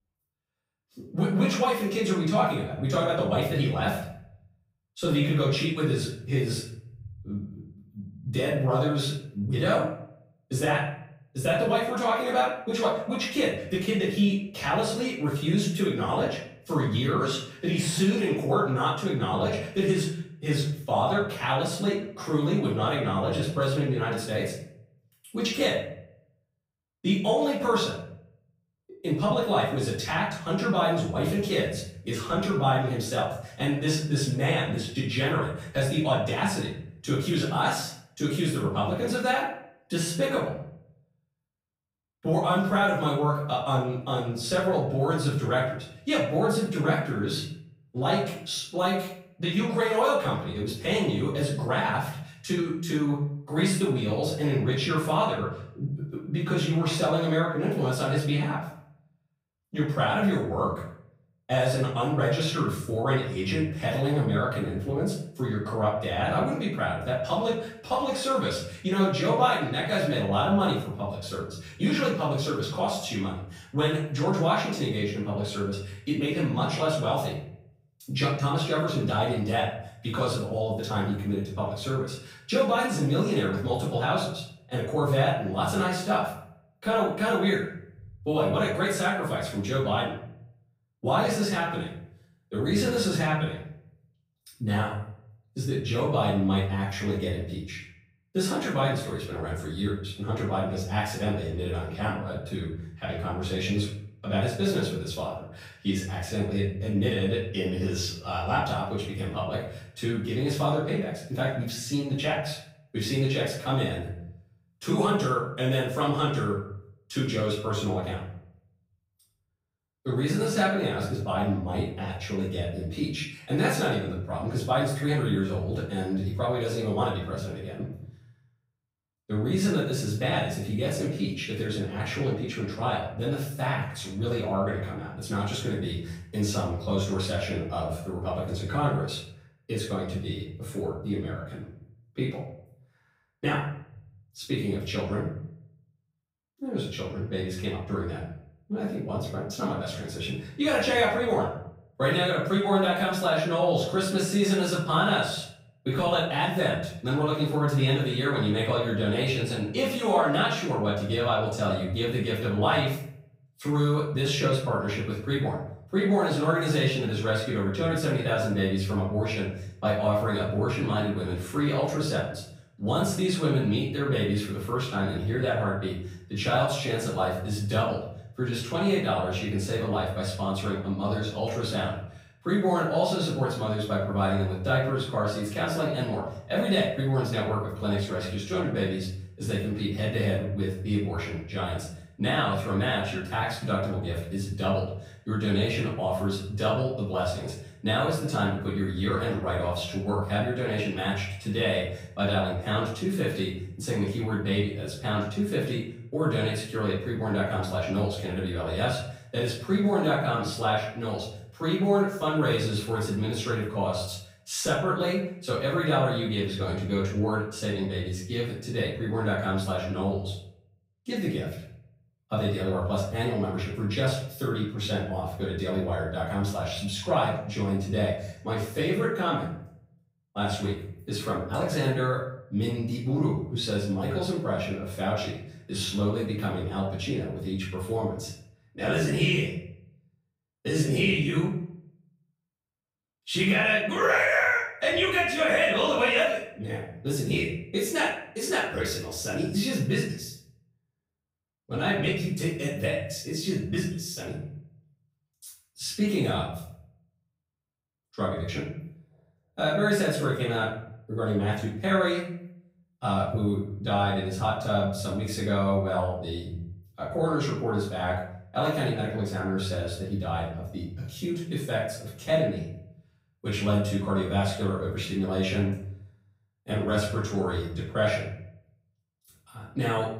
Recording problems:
off-mic speech; far
room echo; noticeable; dies away in 0.6 s

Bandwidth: 15.5 kHz